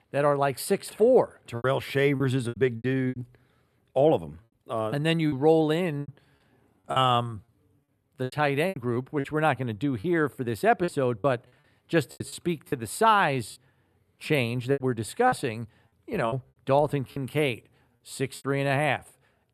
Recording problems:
choppy; very; 10% of the speech affected

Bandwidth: 13.5 kHz